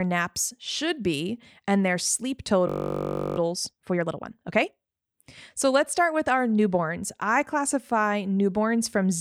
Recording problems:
abrupt cut into speech; at the start and the end
audio freezing; at 2.5 s for 0.5 s

